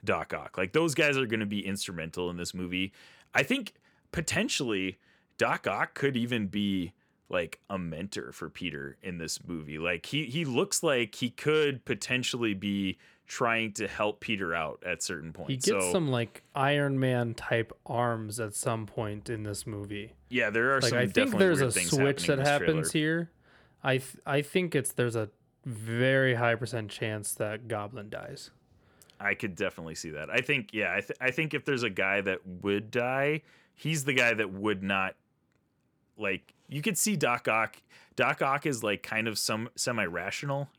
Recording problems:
none

